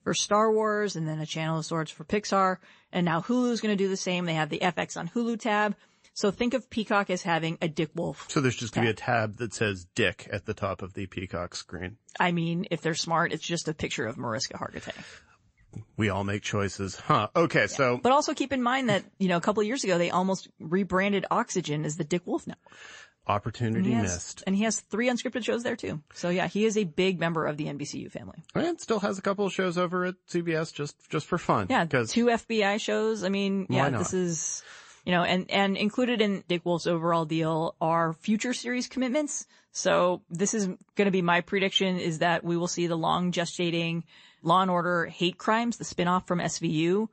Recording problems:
garbled, watery; slightly; nothing above 8 kHz

